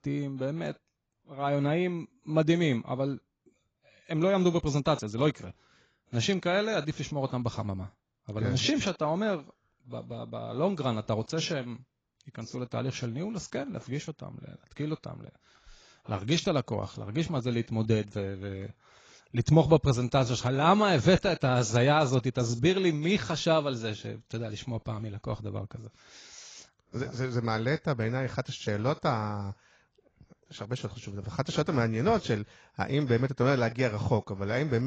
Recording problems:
garbled, watery; badly; nothing above 7.5 kHz
abrupt cut into speech; at the end

